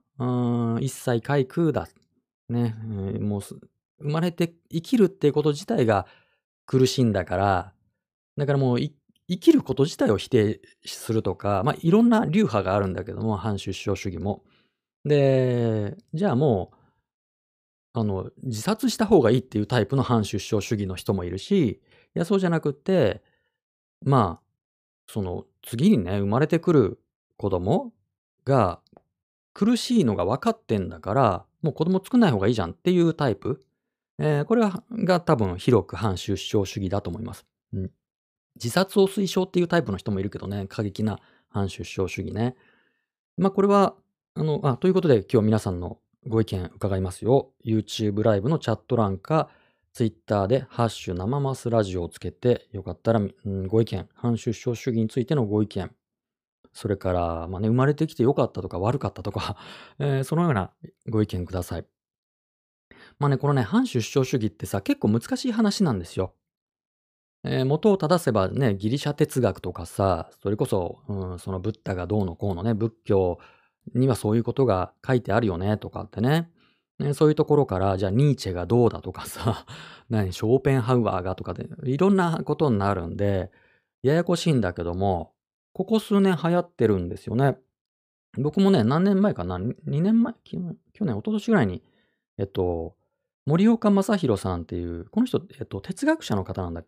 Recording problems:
none

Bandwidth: 15 kHz